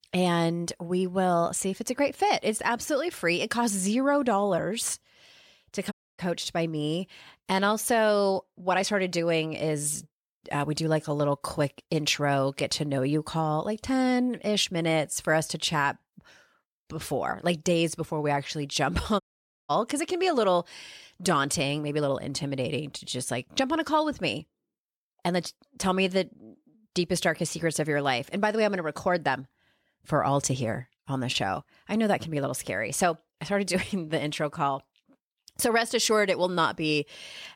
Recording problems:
audio cutting out; at 6 s and at 19 s

